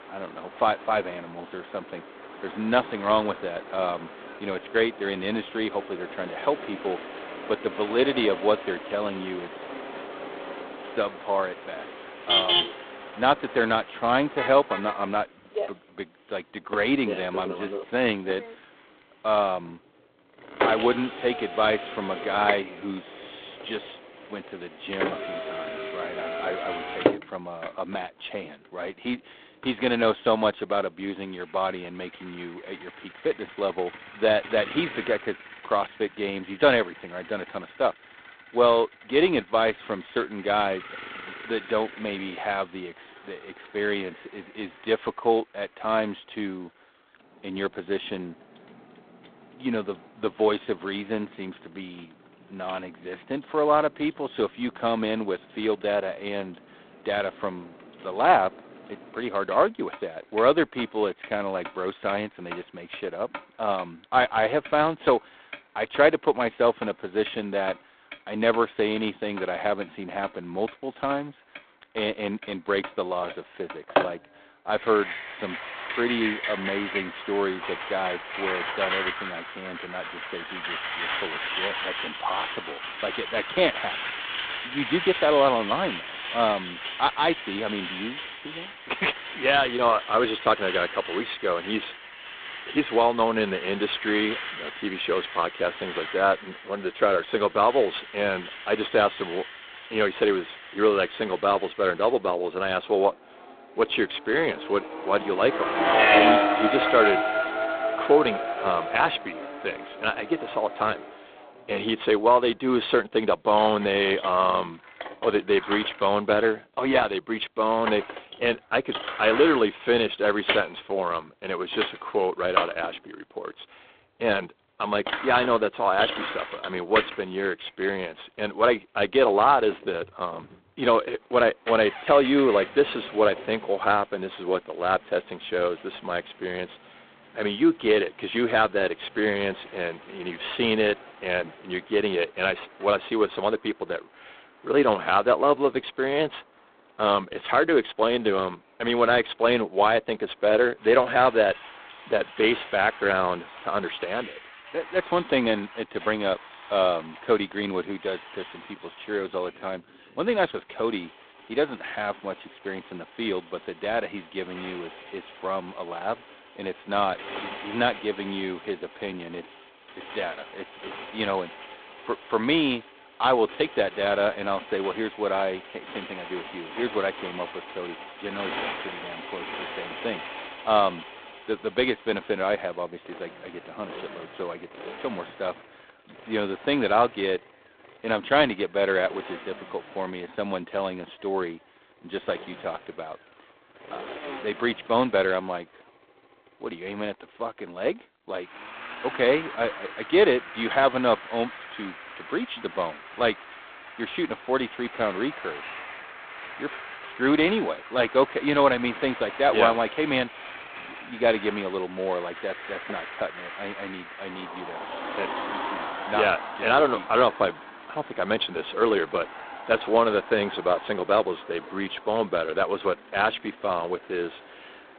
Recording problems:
phone-call audio; poor line; nothing above 3.5 kHz
traffic noise; loud; throughout; 7 dB below the speech

